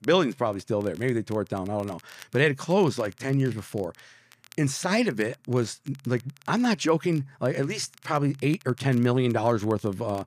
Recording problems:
crackle, like an old record; faint; 25 dB below the speech

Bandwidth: 14.5 kHz